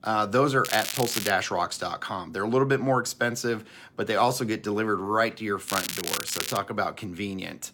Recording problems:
crackling; loud; at 0.5 s and at 5.5 s; 4 dB below the speech

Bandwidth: 17 kHz